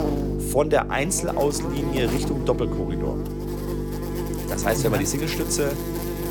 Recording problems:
electrical hum; loud; throughout; 50 Hz, 7 dB below the speech

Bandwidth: 18 kHz